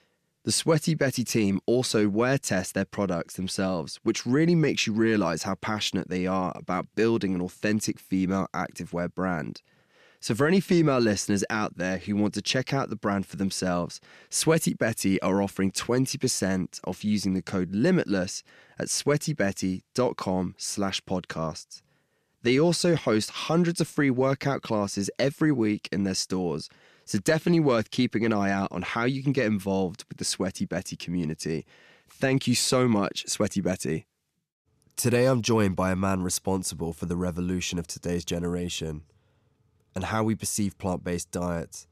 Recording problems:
none

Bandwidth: 14.5 kHz